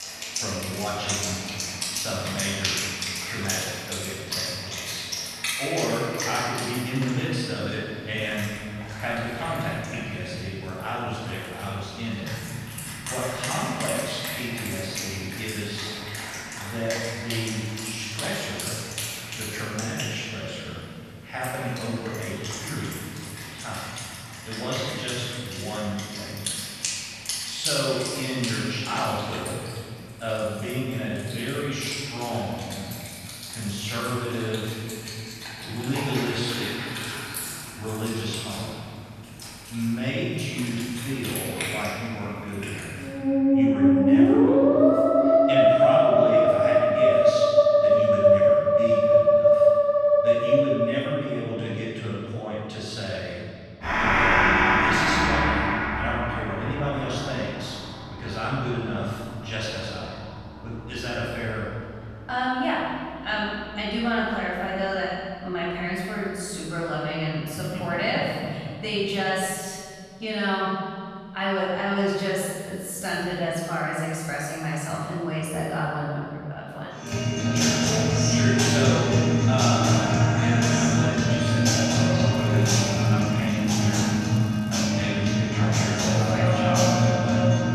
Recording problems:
room echo; strong; dies away in 2 s
off-mic speech; far
background music; very loud; throughout; 7 dB above the speech
crackling; faint; from 1:22 to 1:25; 20 dB below the speech

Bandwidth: 13.5 kHz